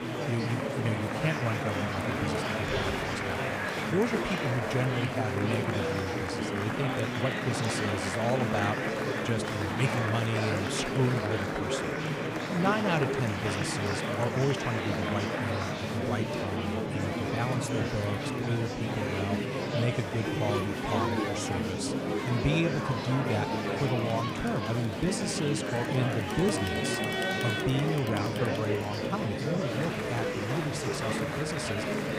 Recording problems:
murmuring crowd; very loud; throughout; 2 dB above the speech

